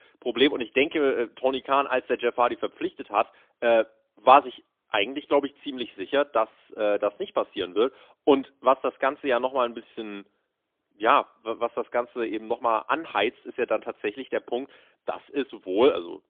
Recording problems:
phone-call audio; poor line; nothing above 3.5 kHz

